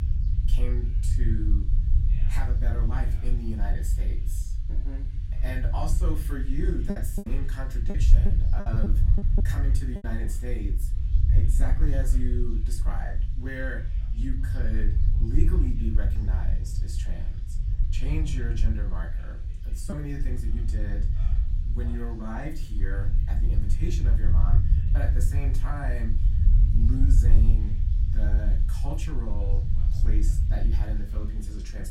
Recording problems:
off-mic speech; far
room echo; very slight; dies away in 0.3 s
low rumble; loud; throughout; 5 dB below the speech
voice in the background; faint; throughout; 25 dB below the speech
hiss; faint; throughout; 25 dB below the speech
choppy; very; from 7 to 10 s; 8% of the speech affected

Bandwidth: 16 kHz